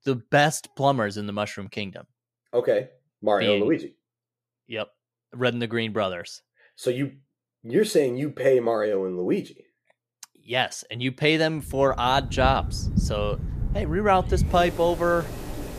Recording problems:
rain or running water; loud; from 12 s on; 6 dB below the speech

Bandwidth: 14.5 kHz